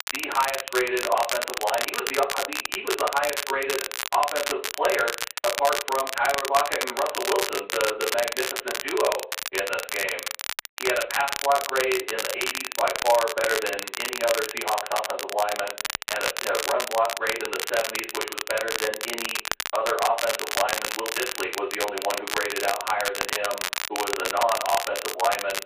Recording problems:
phone-call audio; poor line; nothing above 4 kHz
off-mic speech; far
room echo; slight; dies away in 0.3 s
crackle, like an old record; loud; 2 dB below the speech

